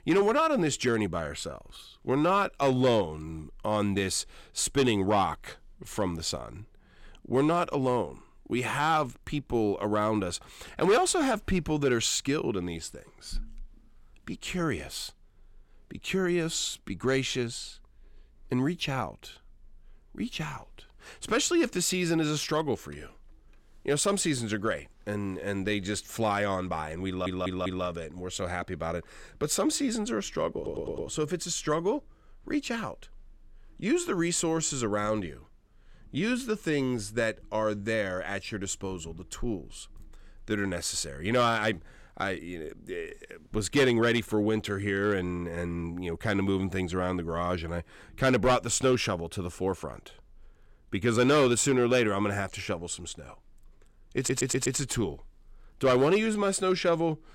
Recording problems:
audio stuttering; at 27 s, at 31 s and at 54 s

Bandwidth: 16.5 kHz